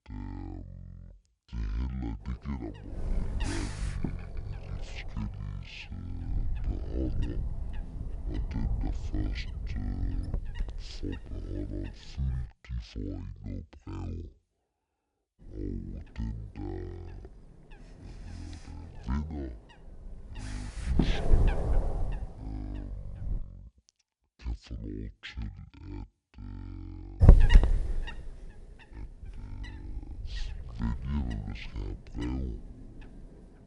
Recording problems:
wrong speed and pitch; too slow and too low; 0.5 times normal speed
wind noise on the microphone; heavy; from 2 to 12 s, from 15 to 23 s and from 27 s on; 3 dB above the speech

